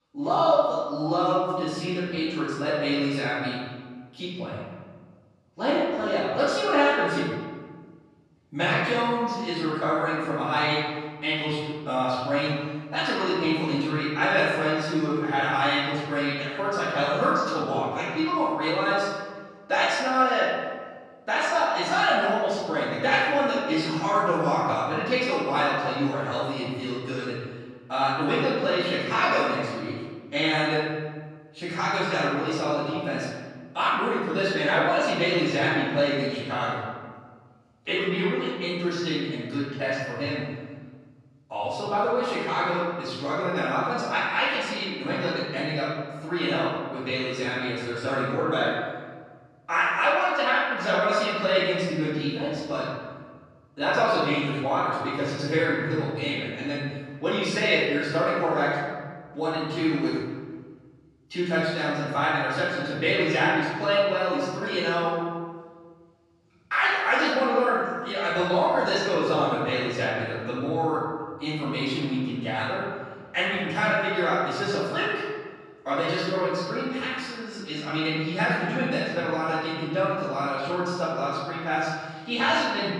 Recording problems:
room echo; strong; dies away in 1.5 s
off-mic speech; far

